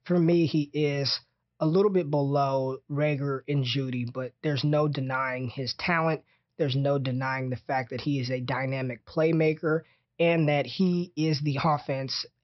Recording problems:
high frequencies cut off; noticeable; nothing above 5.5 kHz

